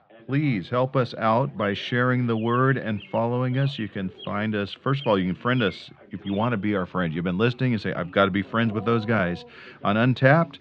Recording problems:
muffled; slightly; fading above 3.5 kHz
animal sounds; faint; throughout; 20 dB below the speech
background chatter; faint; throughout; 2 voices, 25 dB below the speech

